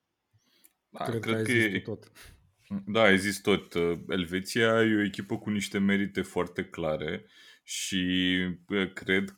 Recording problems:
none

